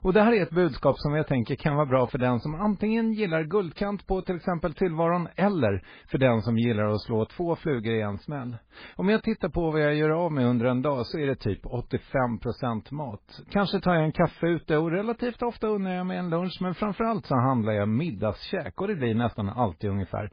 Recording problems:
garbled, watery; badly; nothing above 5 kHz

